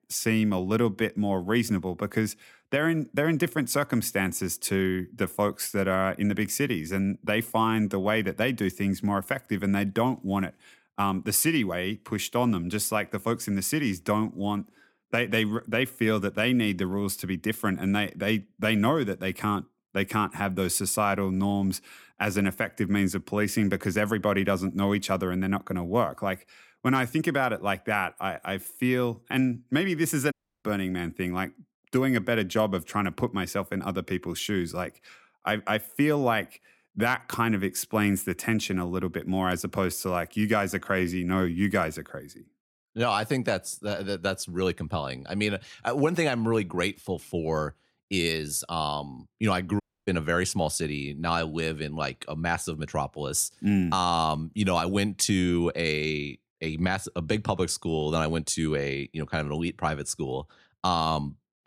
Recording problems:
audio cutting out; at 30 s and at 50 s

